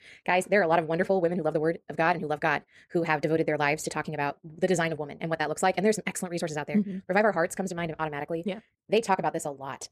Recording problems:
wrong speed, natural pitch; too fast; 1.7 times normal speed

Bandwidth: 14.5 kHz